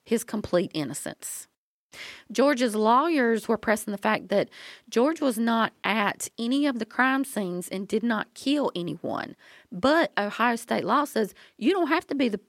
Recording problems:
none

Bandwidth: 16.5 kHz